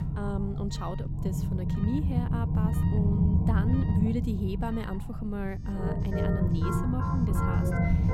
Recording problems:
background music; loud; throughout; 4 dB below the speech
low rumble; loud; throughout; as loud as the speech
alarms or sirens; noticeable; throughout; 20 dB below the speech

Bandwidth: 16 kHz